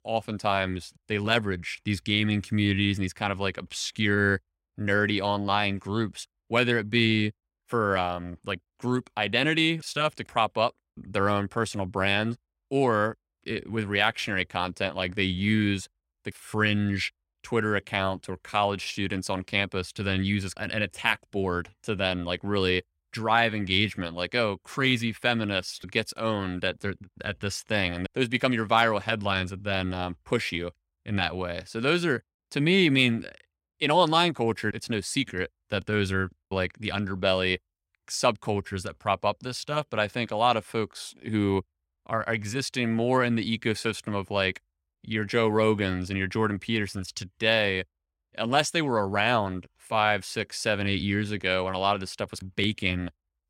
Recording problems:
none

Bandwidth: 16 kHz